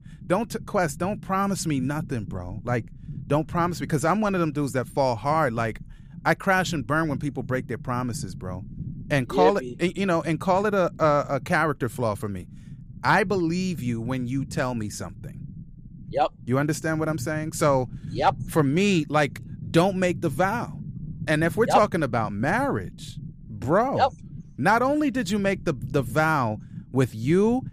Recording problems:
low rumble; faint; throughout; 25 dB below the speech

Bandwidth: 15 kHz